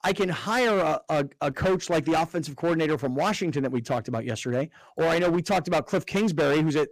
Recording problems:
distortion; heavy; 16% of the sound clipped

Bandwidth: 15 kHz